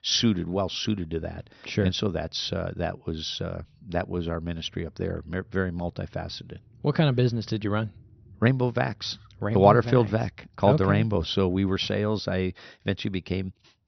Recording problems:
high frequencies cut off; noticeable; nothing above 6 kHz

